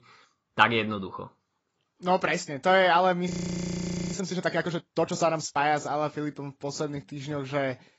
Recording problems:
garbled, watery; badly; nothing above 7.5 kHz
audio freezing; at 3.5 s for 1 s

